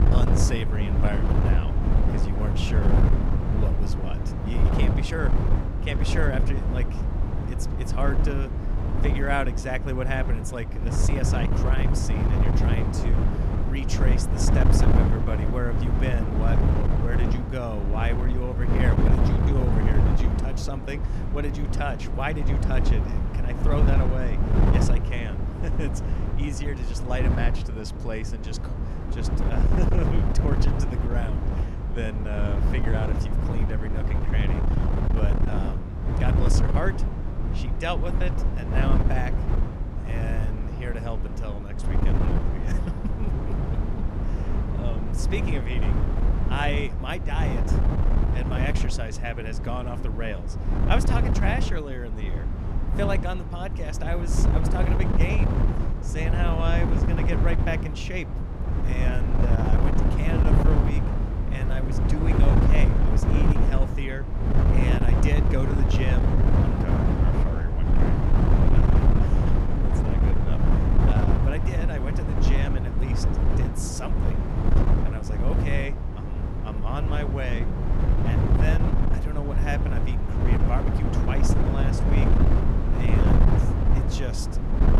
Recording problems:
wind noise on the microphone; heavy; as loud as the speech

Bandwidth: 15 kHz